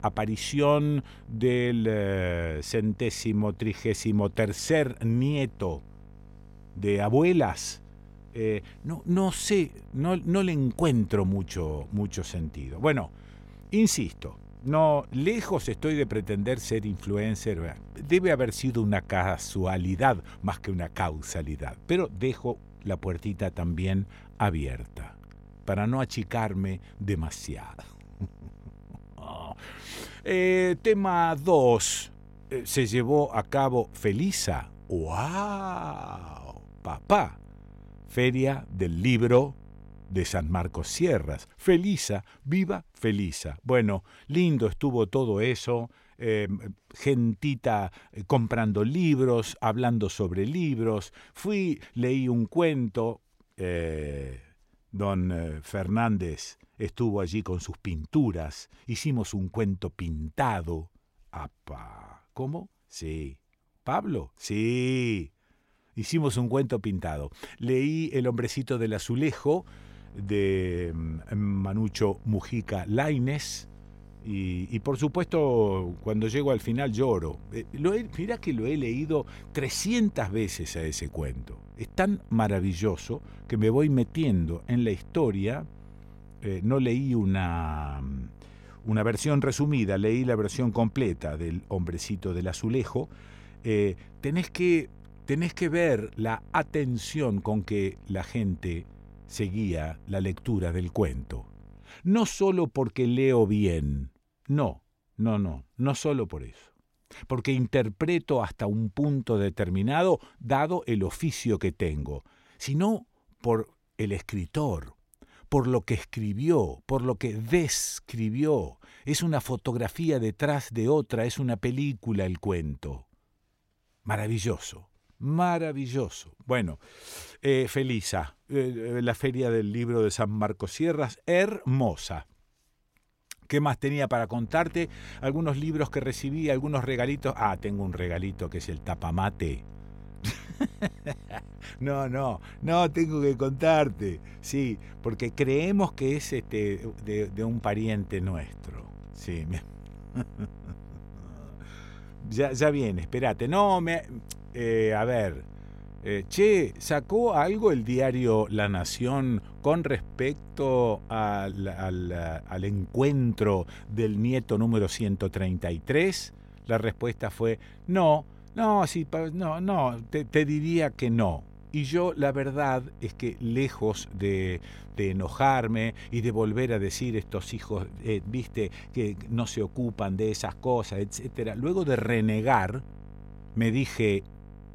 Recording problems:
electrical hum; faint; until 41 s, from 1:10 to 1:42 and from 2:14 on; 50 Hz, 30 dB below the speech

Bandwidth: 16 kHz